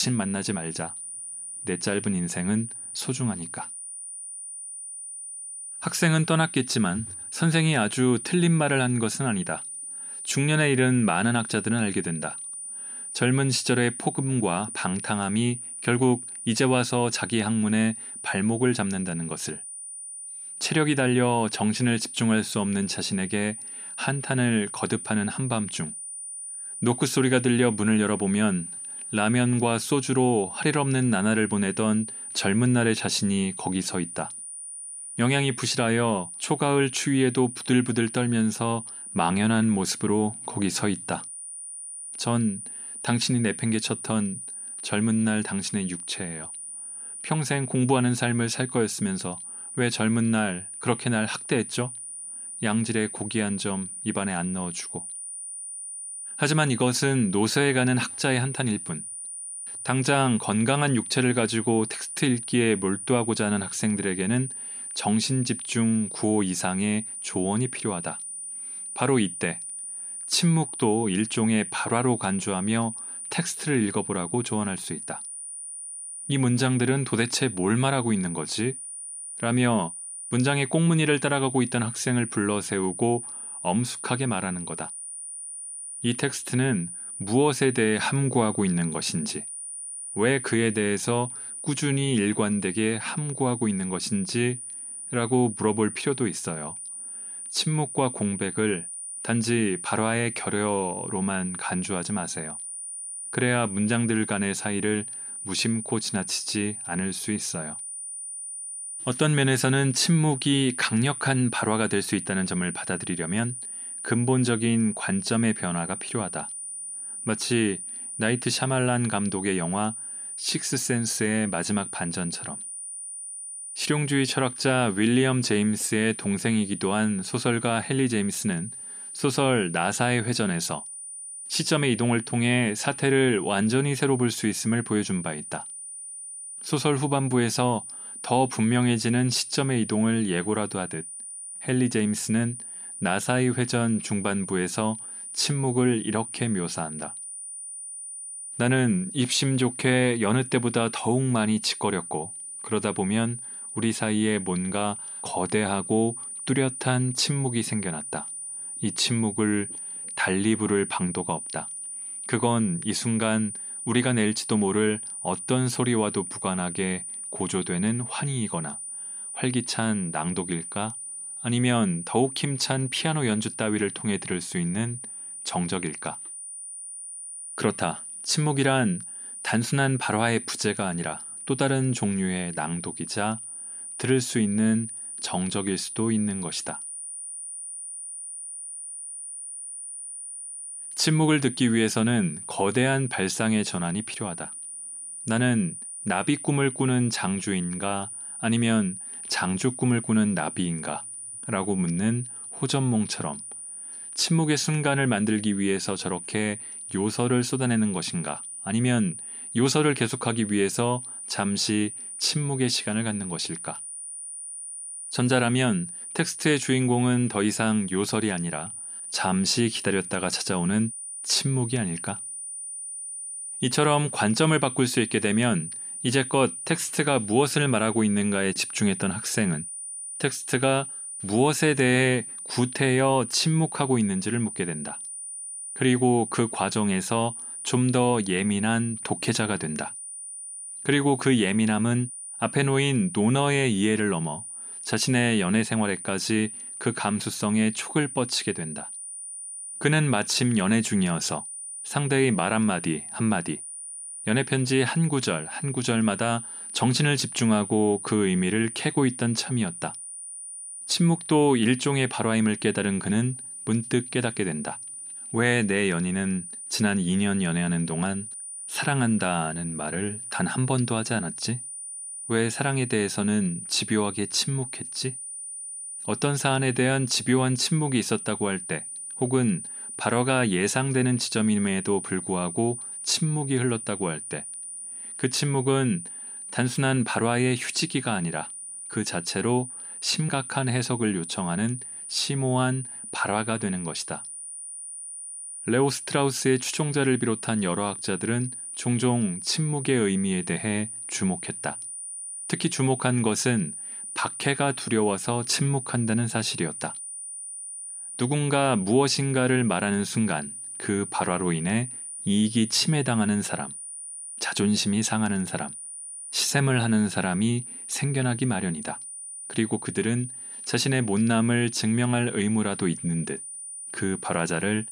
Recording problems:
high-pitched whine; loud; throughout; 9.5 kHz, 9 dB below the speech
abrupt cut into speech; at the start

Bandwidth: 15 kHz